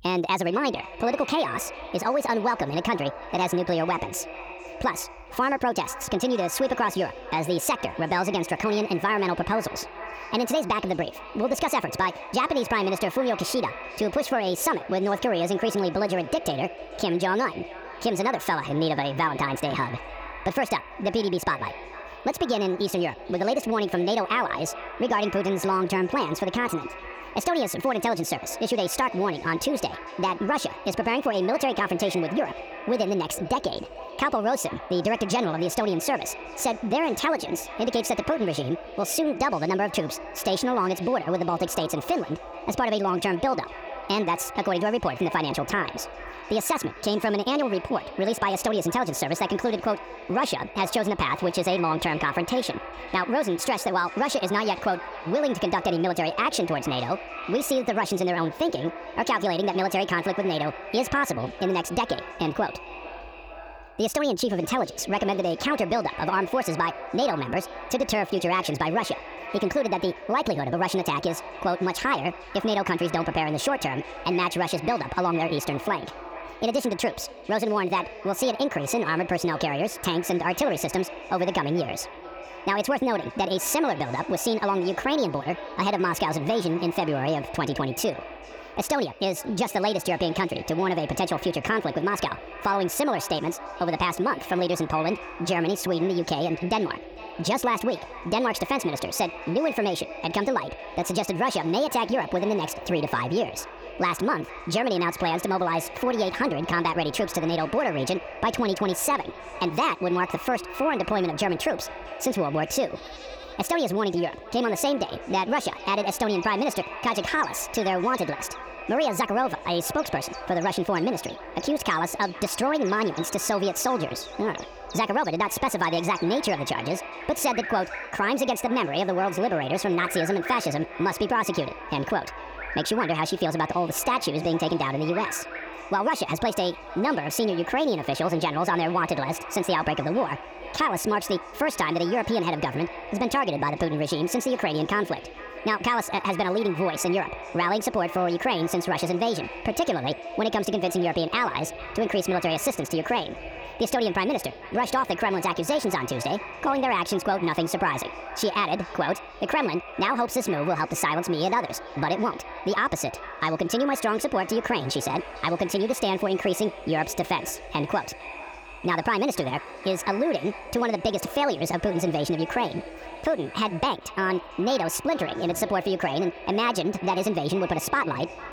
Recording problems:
wrong speed and pitch; too fast and too high; 1.5 times normal speed
echo of what is said; noticeable; throughout; 450 ms later, 10 dB below the speech
animal sounds; noticeable; from 1:46 on; 20 dB below the speech

